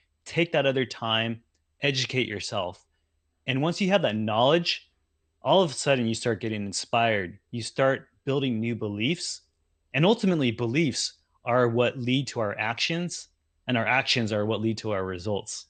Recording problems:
garbled, watery; slightly; nothing above 8.5 kHz

